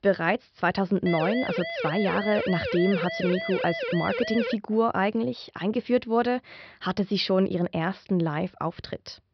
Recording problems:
high frequencies cut off; noticeable; nothing above 5.5 kHz
siren; noticeable; from 1 to 4.5 s; peak 3 dB below the speech

